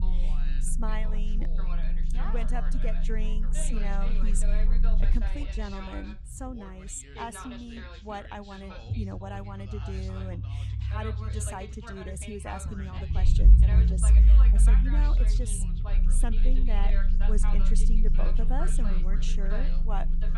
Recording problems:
background chatter; loud; throughout; 2 voices, 7 dB below the speech
low rumble; loud; throughout; 6 dB below the speech

